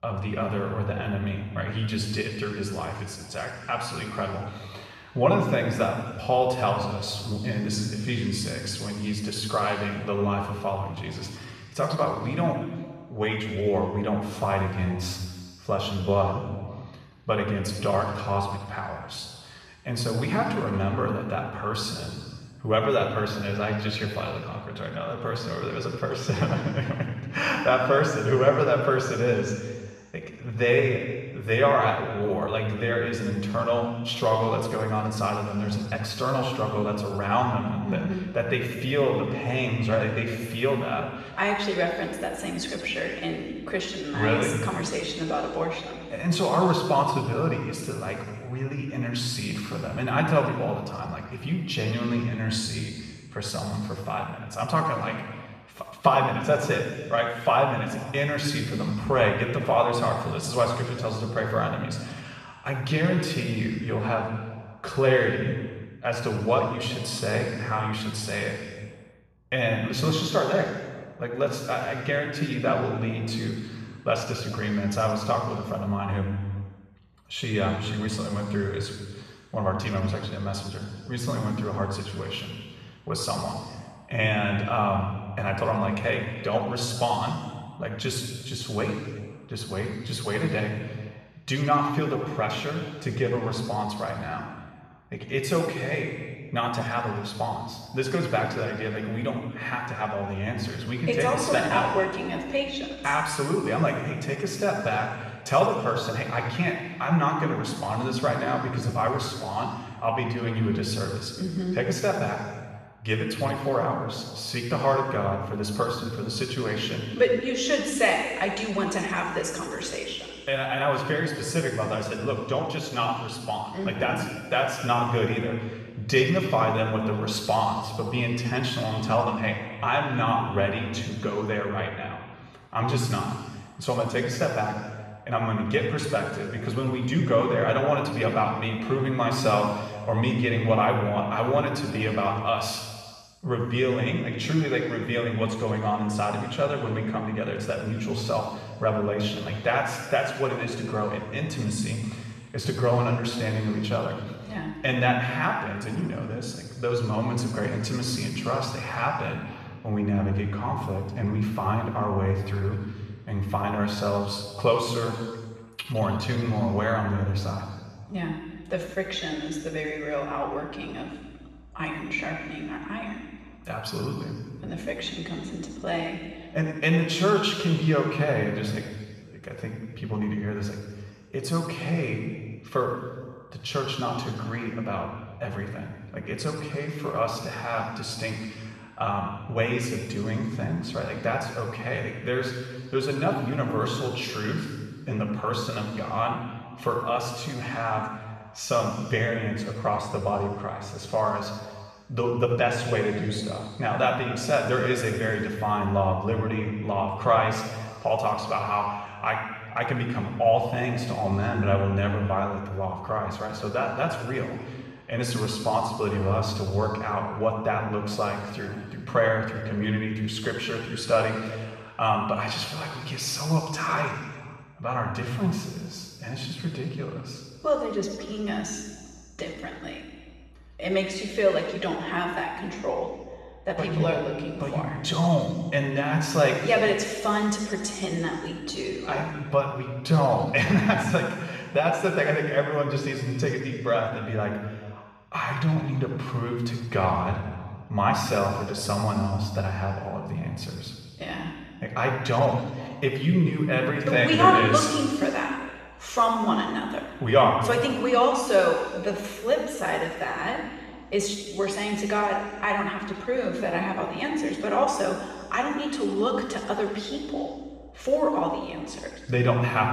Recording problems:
off-mic speech; far
room echo; noticeable; dies away in 1.5 s

